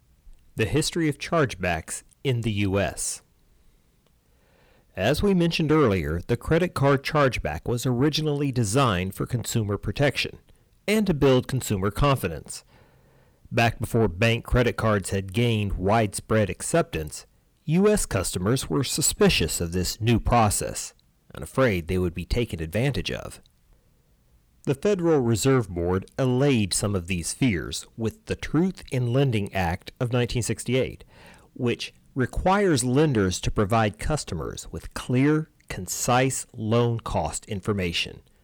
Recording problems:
distortion; slight; 10 dB below the speech

